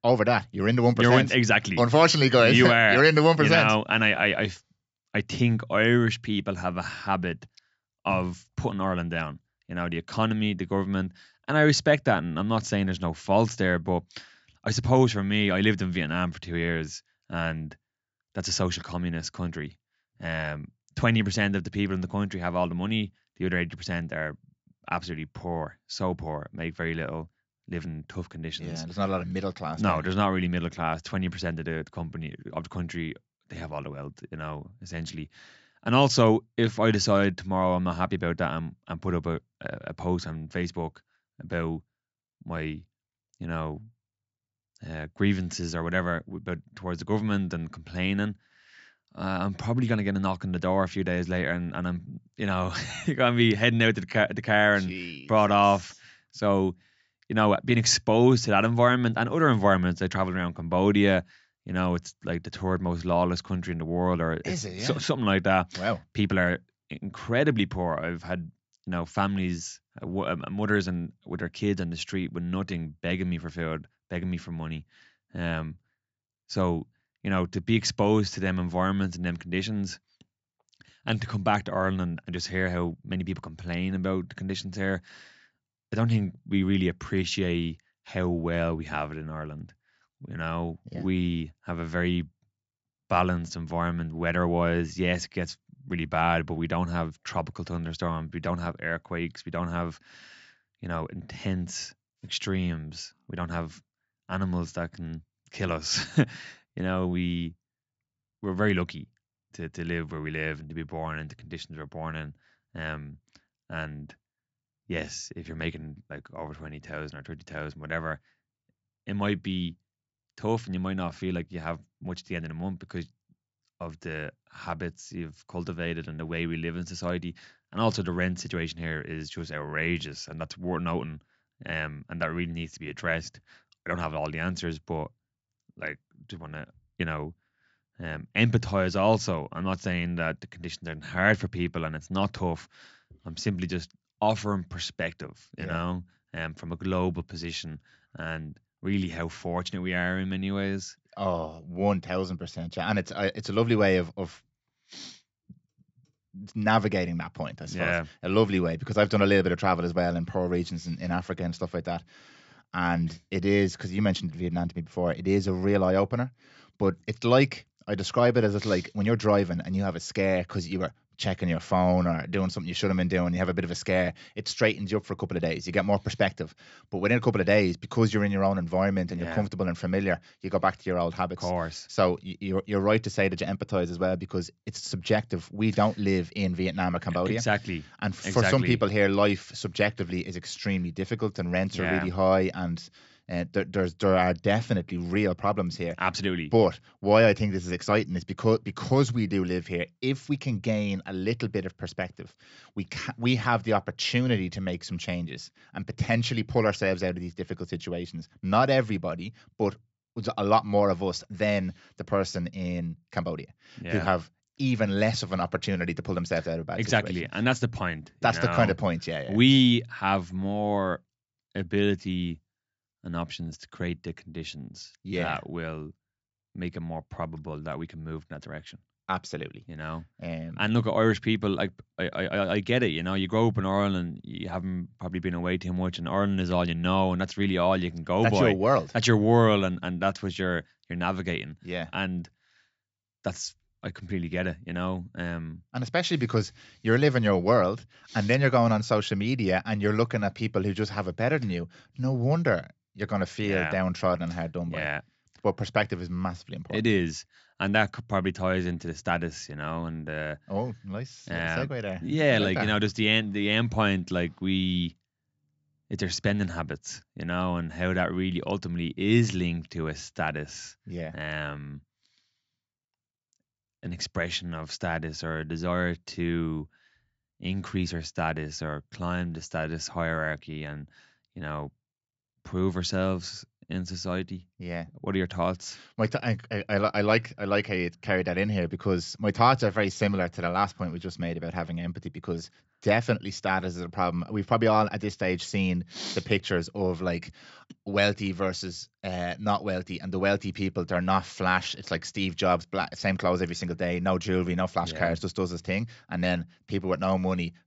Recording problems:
high frequencies cut off; noticeable; nothing above 8 kHz

